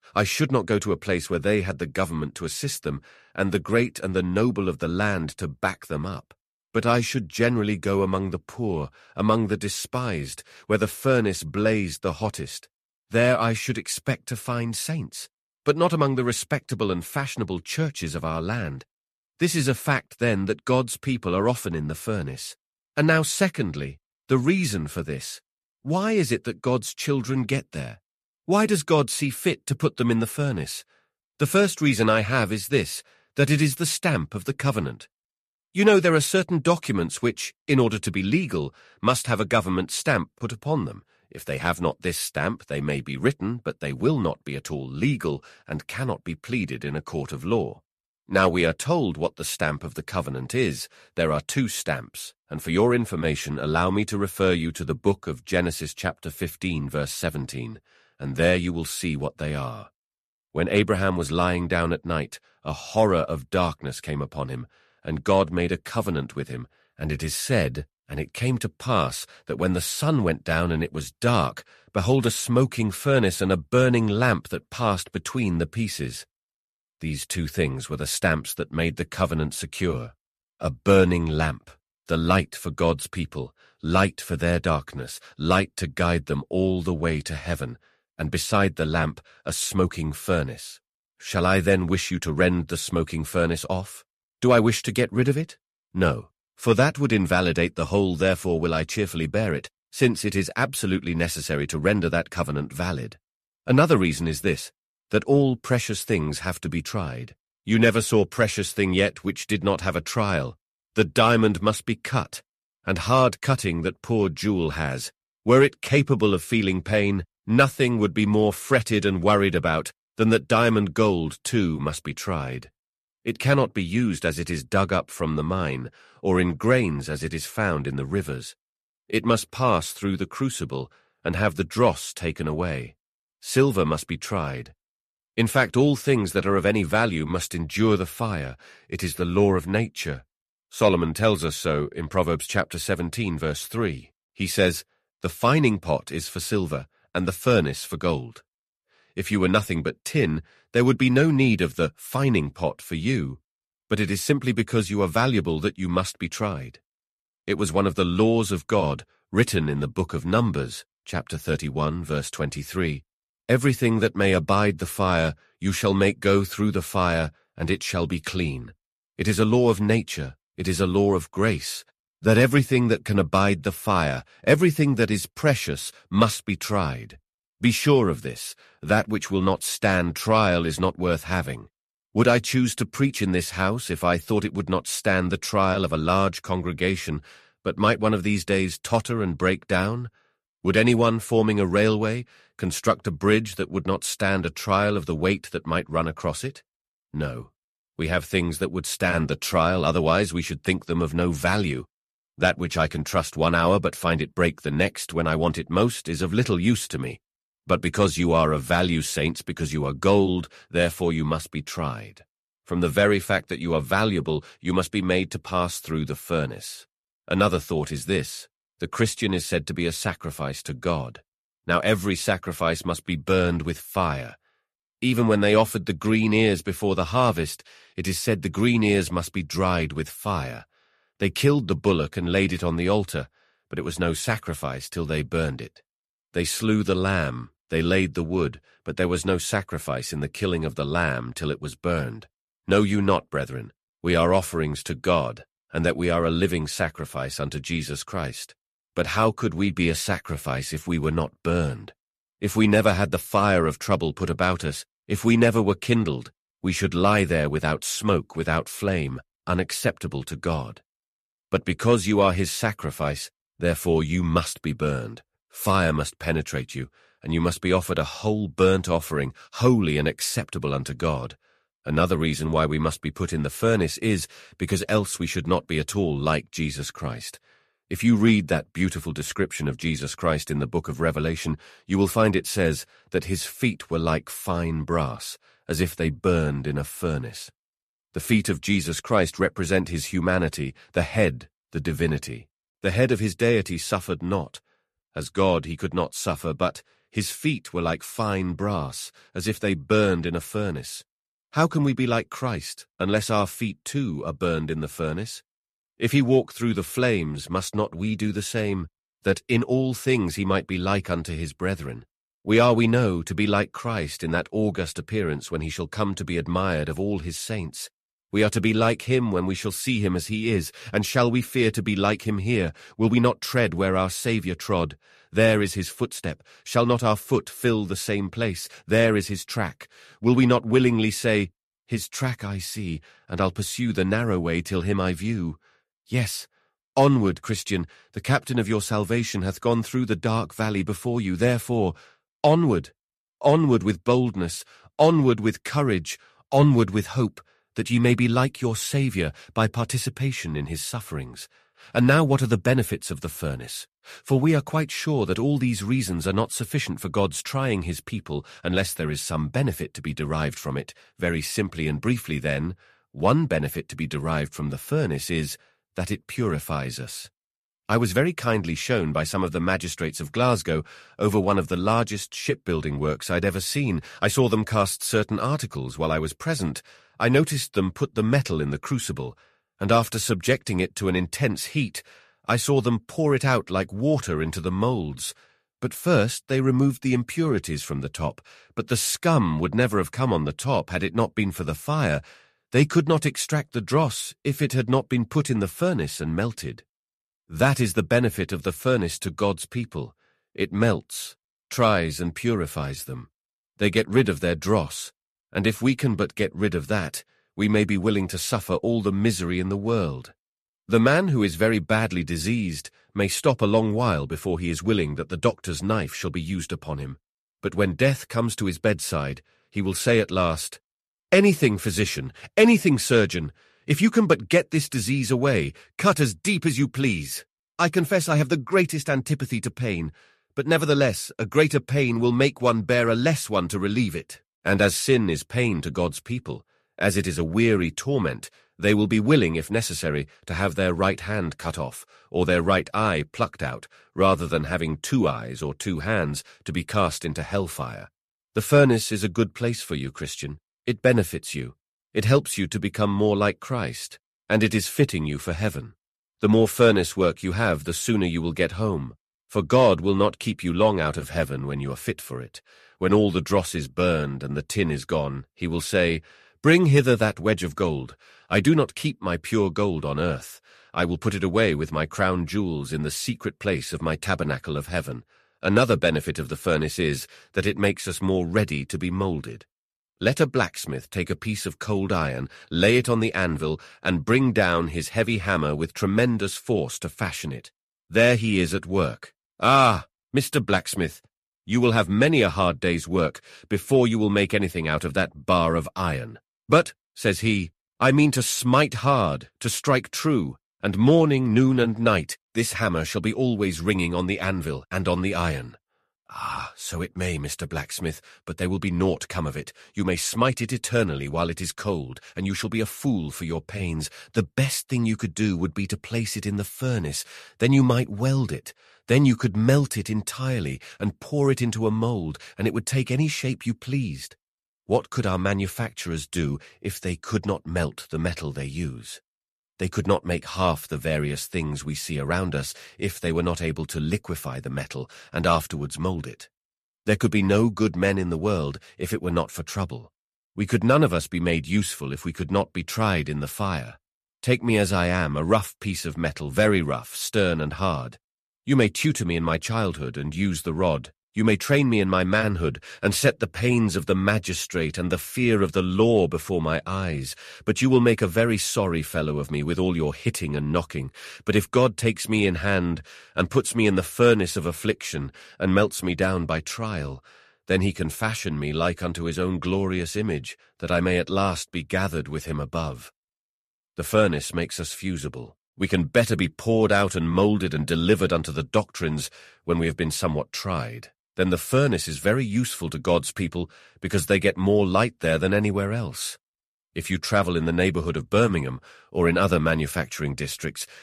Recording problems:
none

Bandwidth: 14 kHz